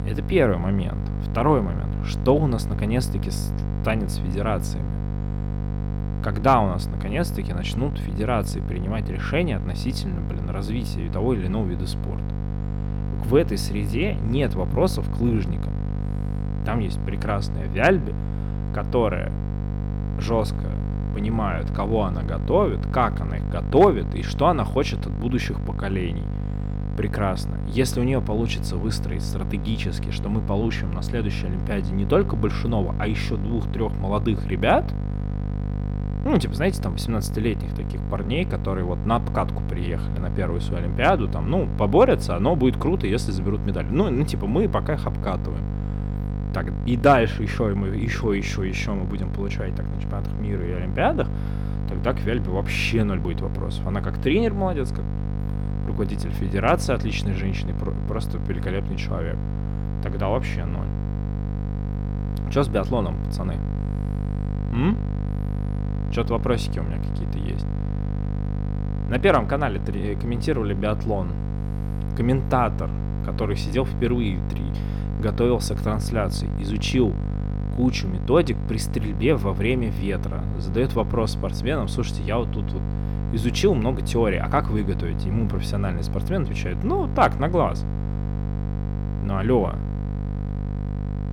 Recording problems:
electrical hum; noticeable; throughout; 50 Hz, 10 dB below the speech

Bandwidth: 17.5 kHz